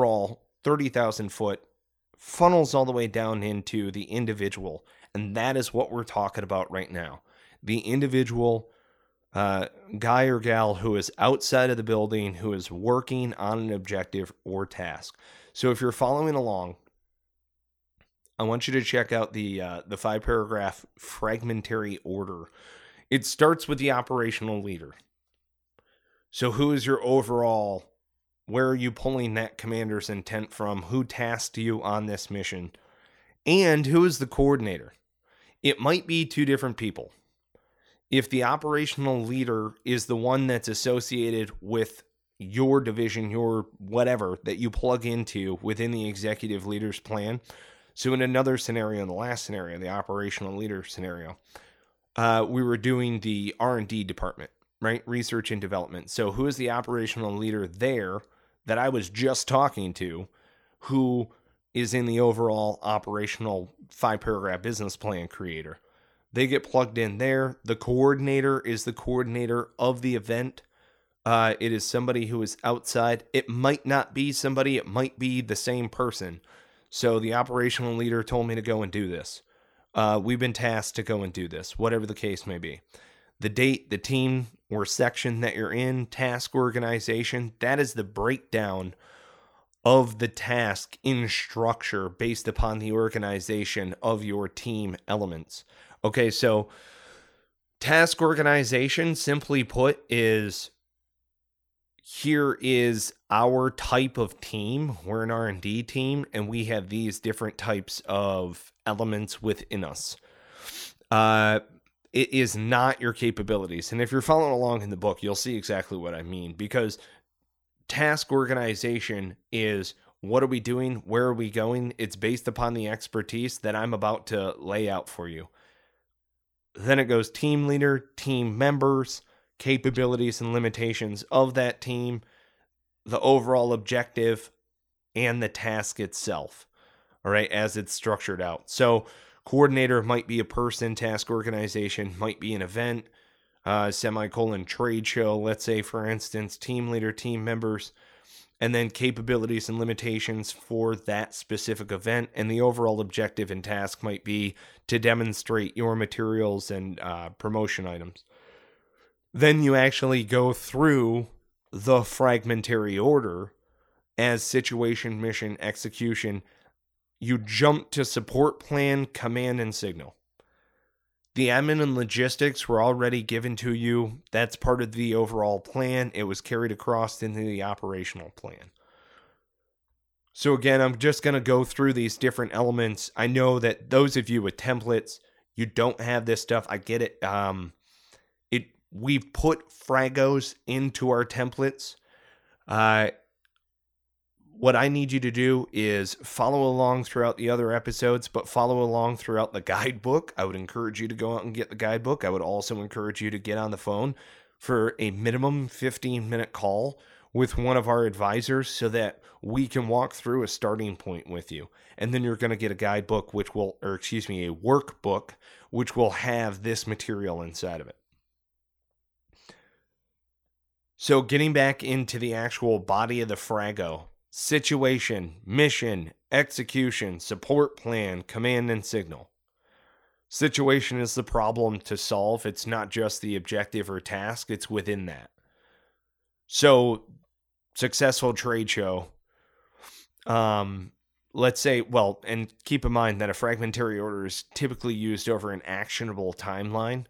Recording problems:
abrupt cut into speech; at the start

